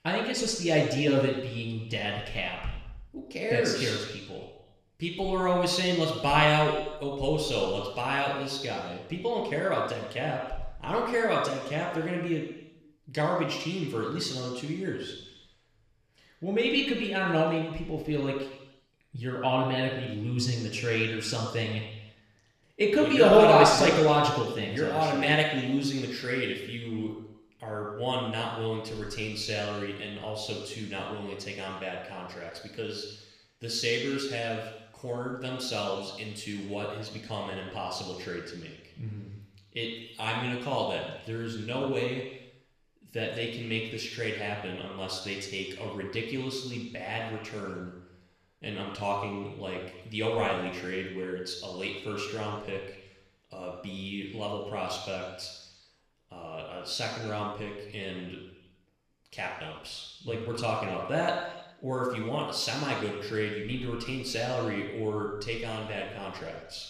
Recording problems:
room echo; noticeable; dies away in 1 s
off-mic speech; somewhat distant

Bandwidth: 14.5 kHz